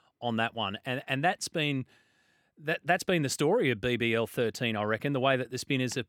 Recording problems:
none

